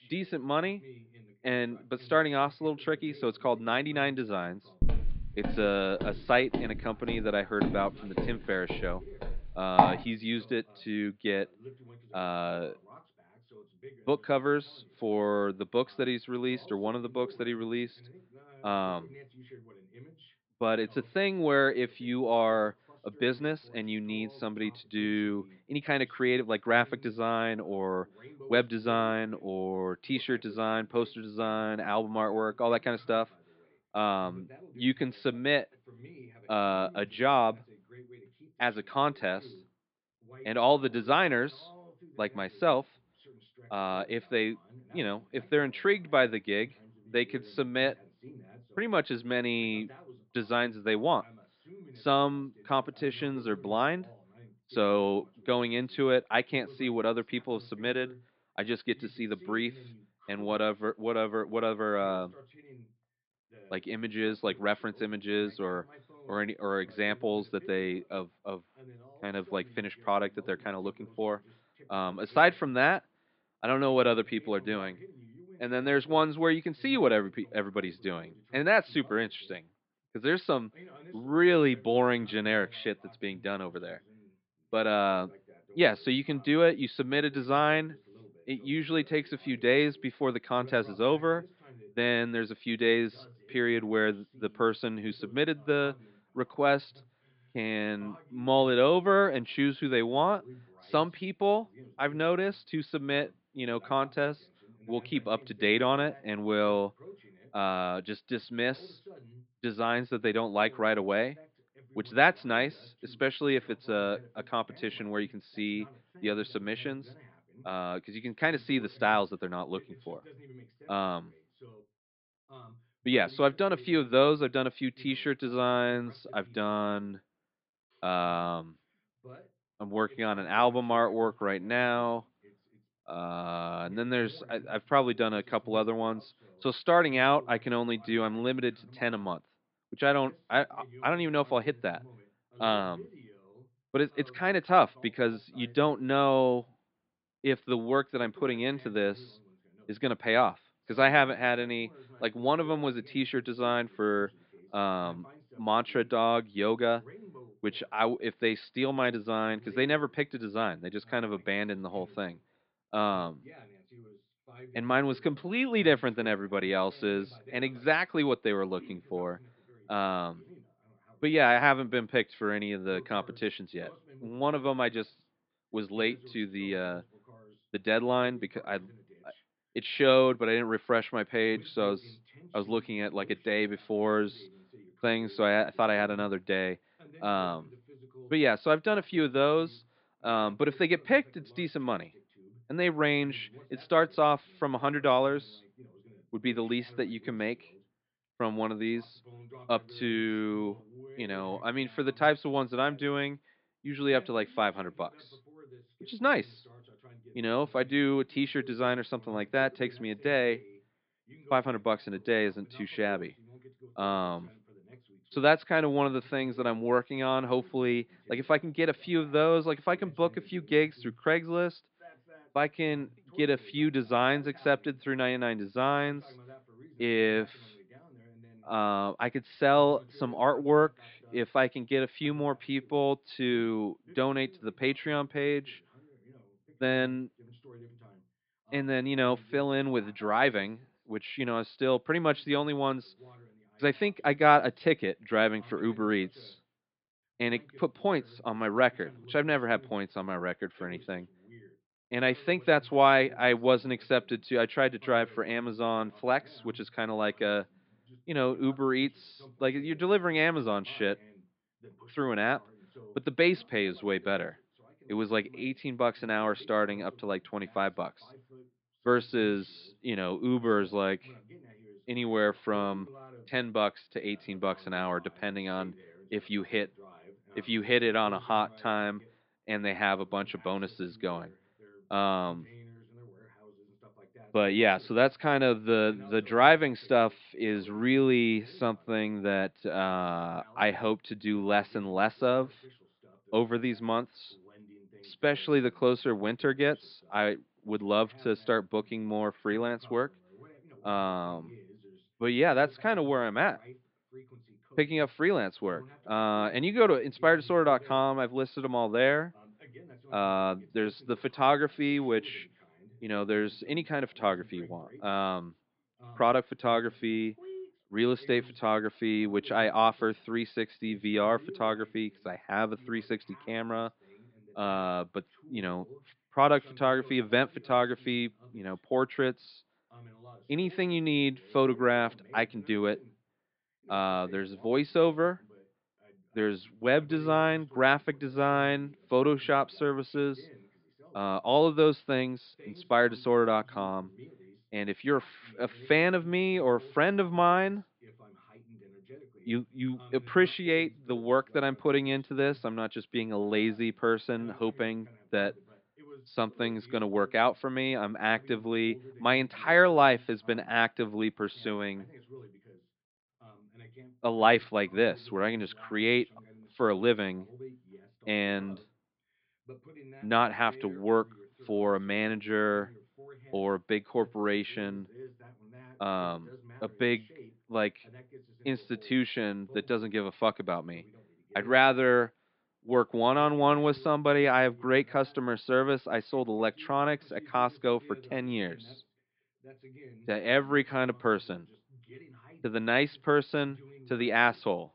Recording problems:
high frequencies cut off; severe; nothing above 5 kHz
muffled; slightly; fading above 4 kHz
voice in the background; faint; throughout; 25 dB below the speech
footsteps; loud; from 5 to 10 s; peak 5 dB above the speech

